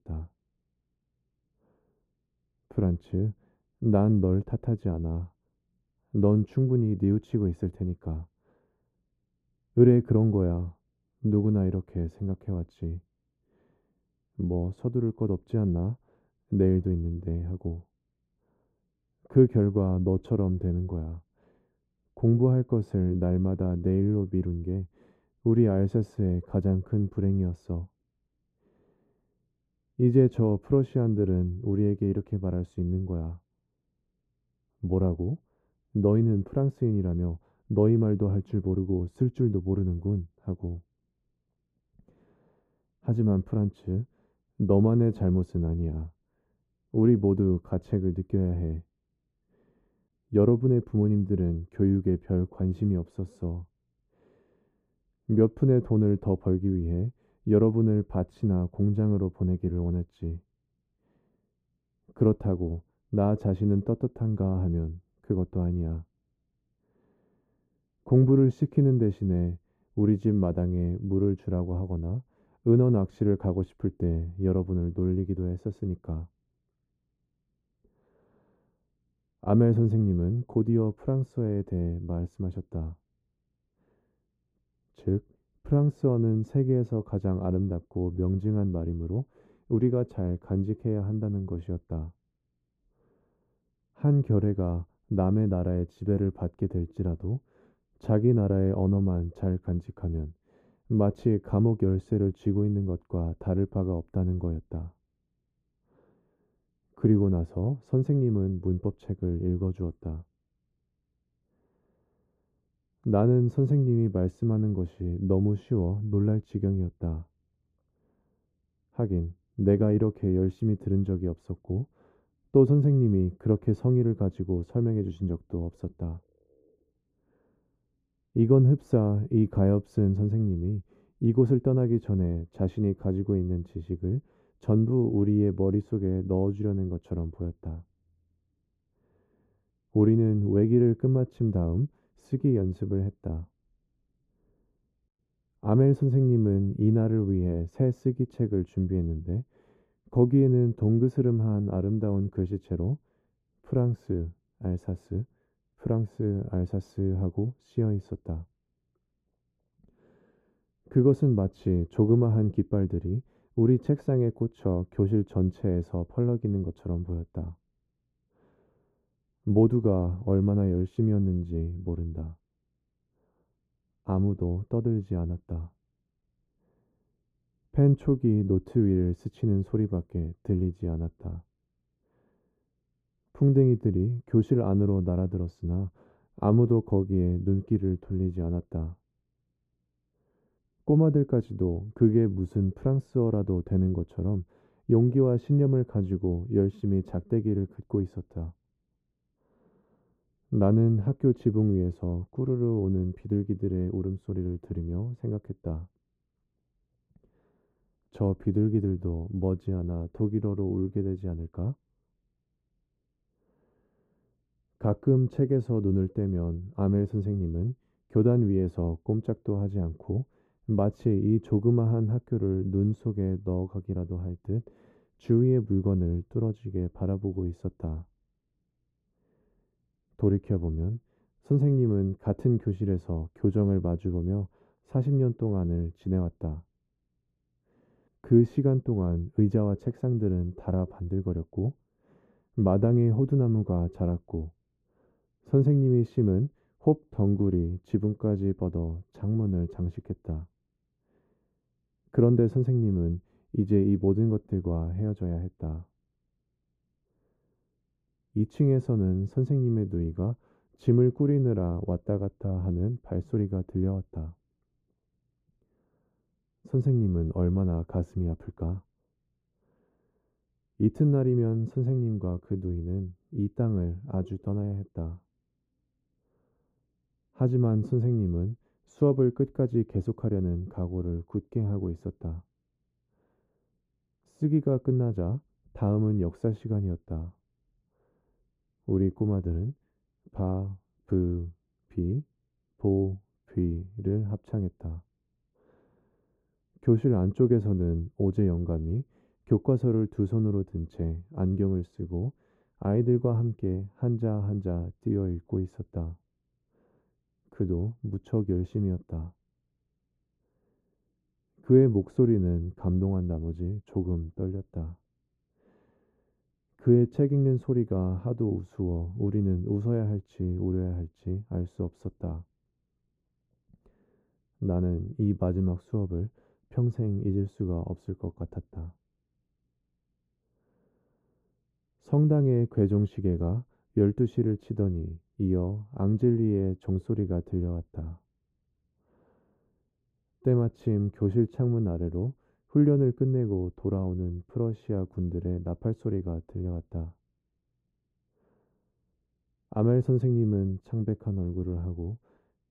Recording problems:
muffled; very; fading above 1 kHz

